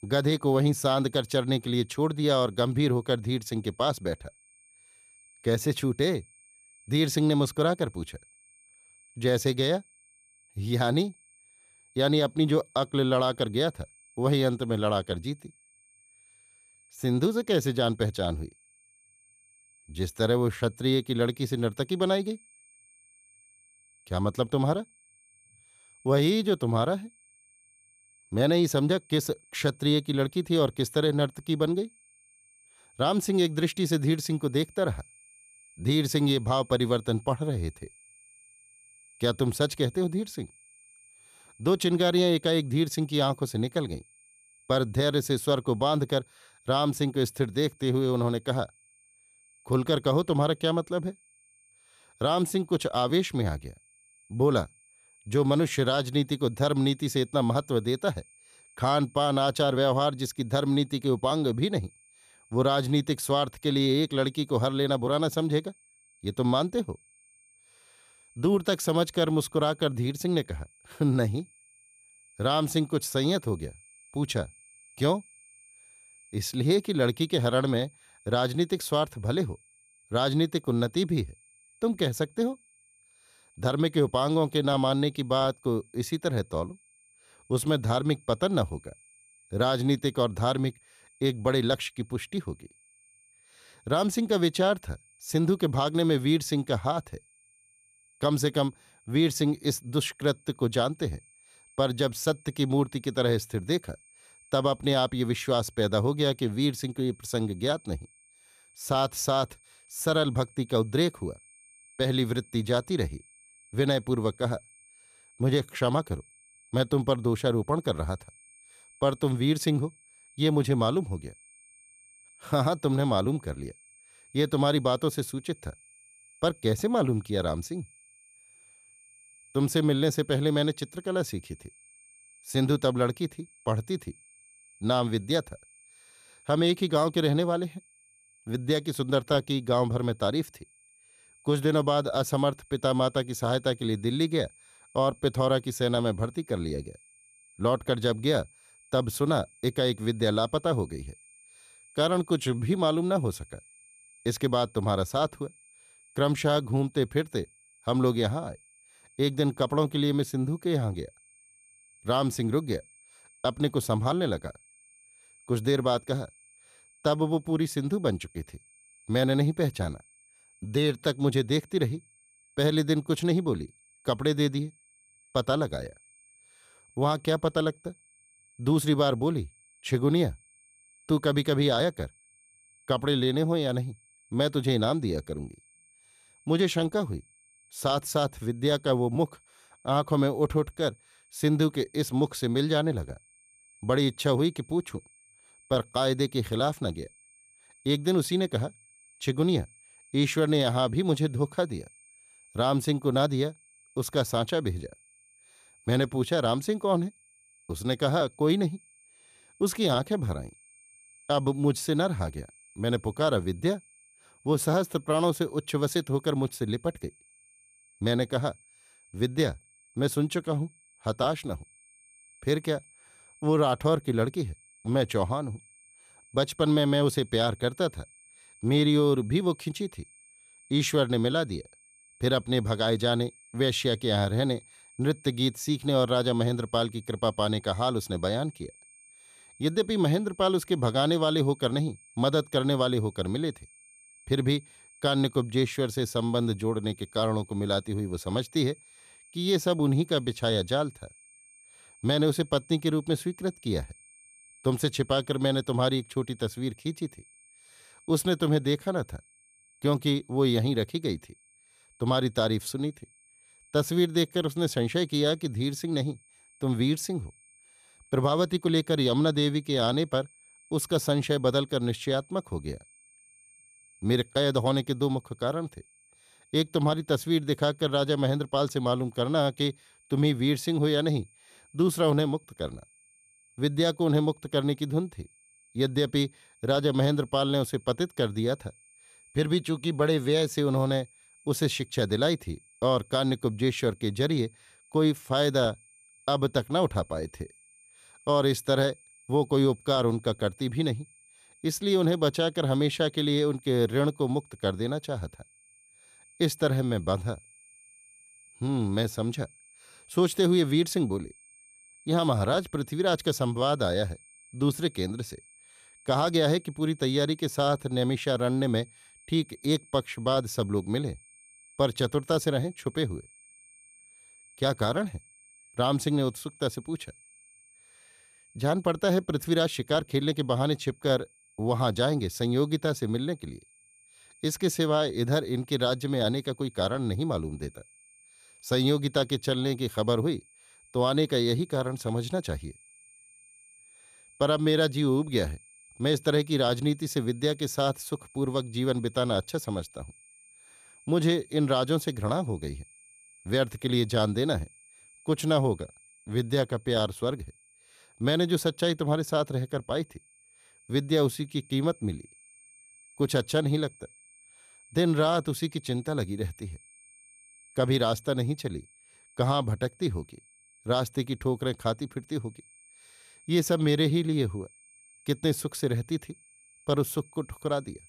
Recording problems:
high-pitched whine; faint; throughout; 8.5 kHz, 30 dB below the speech

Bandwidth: 14.5 kHz